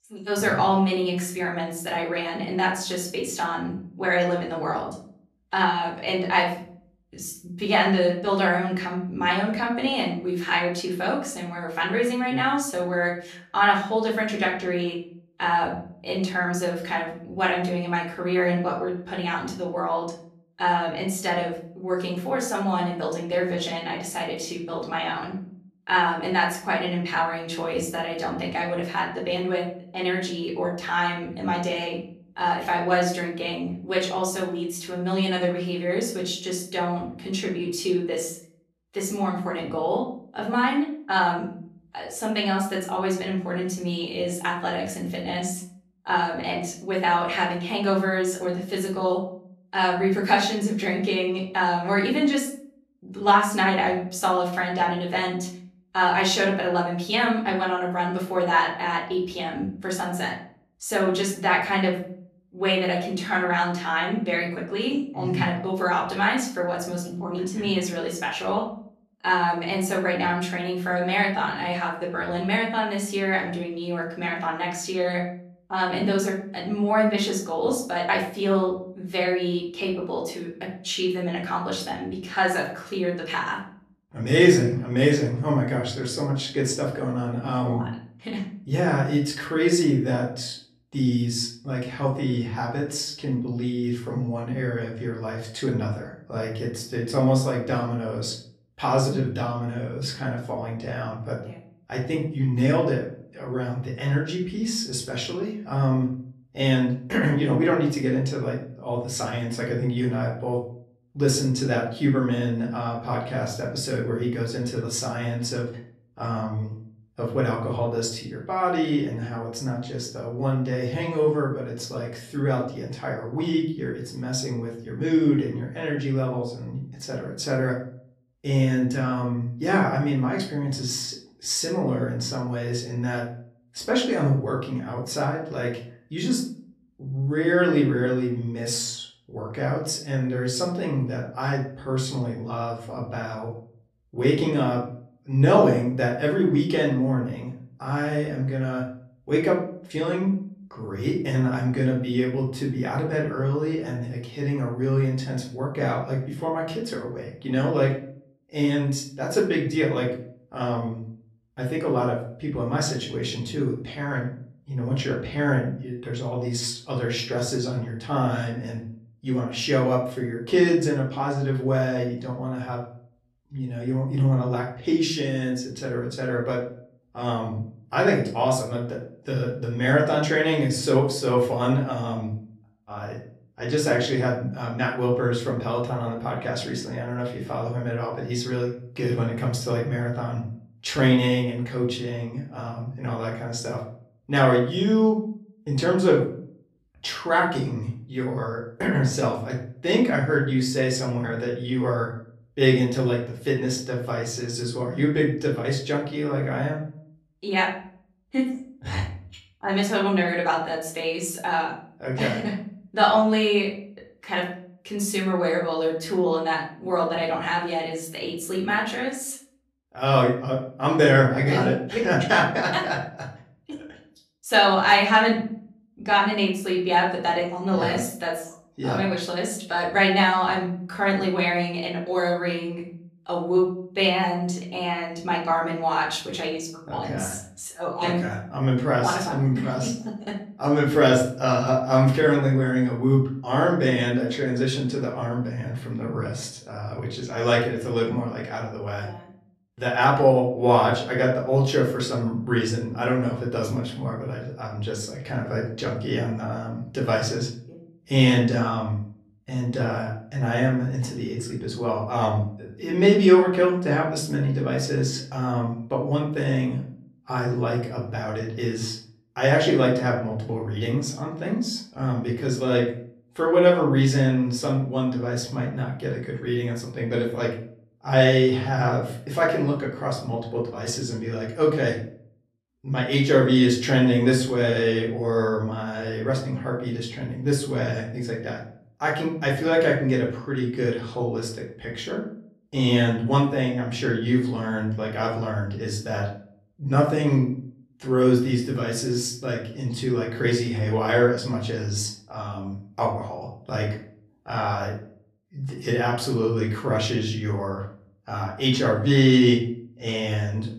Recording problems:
off-mic speech; far
room echo; slight; dies away in 0.4 s

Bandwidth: 14 kHz